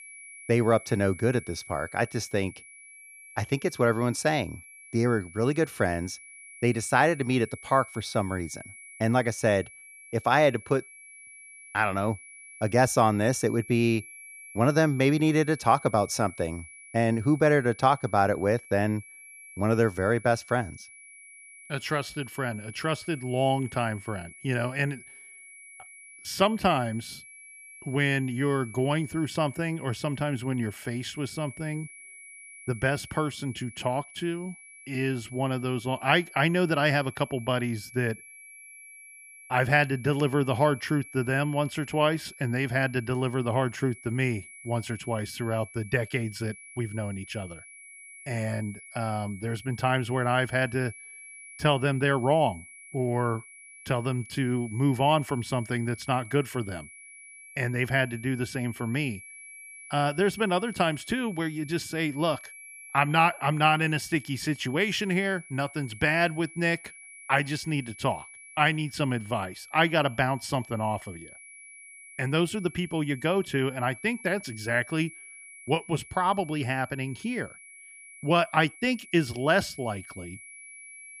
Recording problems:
high-pitched whine; noticeable; throughout; 2.5 kHz, 20 dB below the speech

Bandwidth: 14.5 kHz